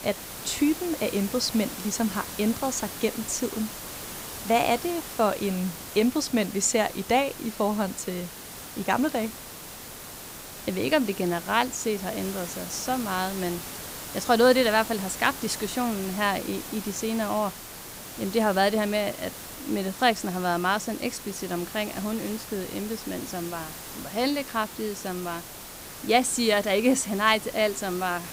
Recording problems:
hiss; noticeable; throughout; 10 dB below the speech

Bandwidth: 15.5 kHz